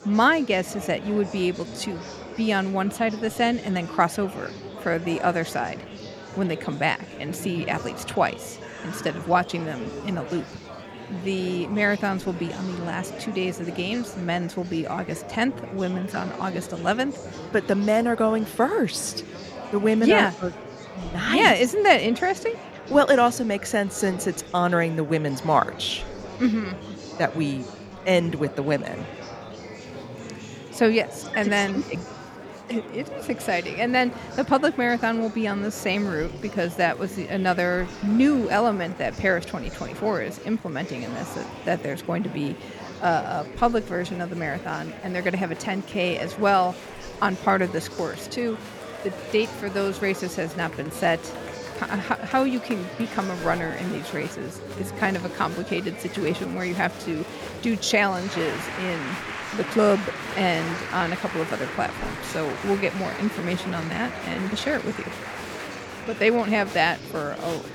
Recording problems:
murmuring crowd; noticeable; throughout; 10 dB below the speech

